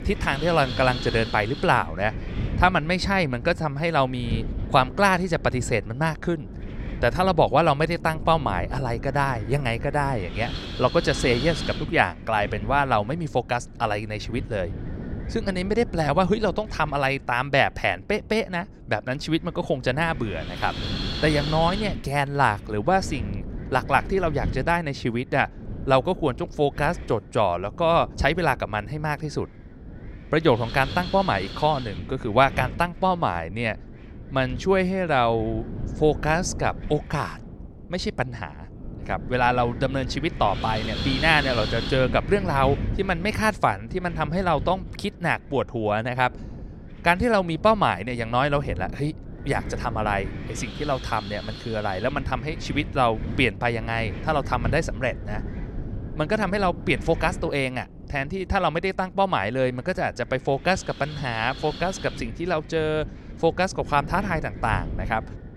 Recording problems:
wind noise on the microphone; occasional gusts; 15 dB below the speech

